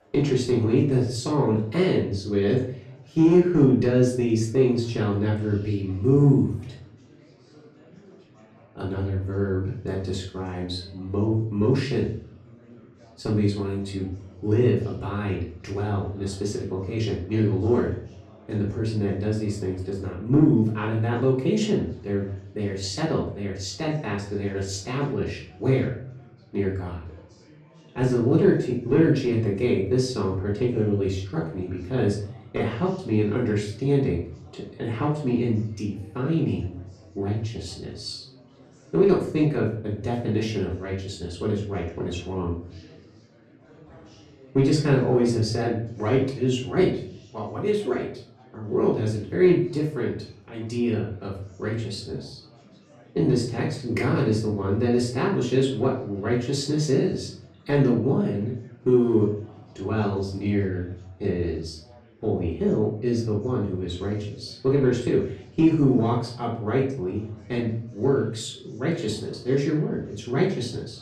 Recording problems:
off-mic speech; far
room echo; slight; dies away in 0.5 s
chatter from many people; faint; throughout; 25 dB below the speech

